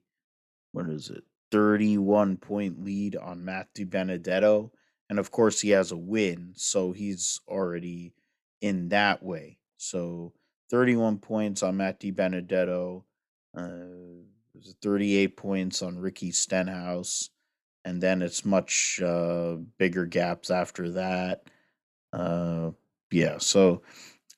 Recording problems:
none

